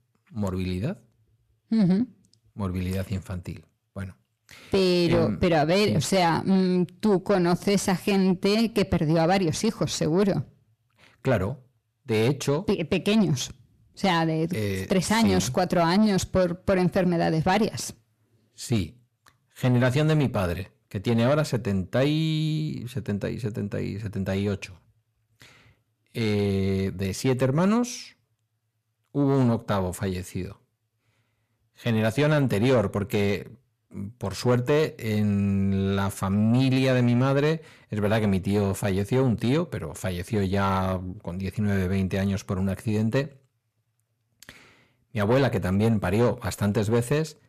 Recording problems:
distortion; slight; 10 dB below the speech

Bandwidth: 14.5 kHz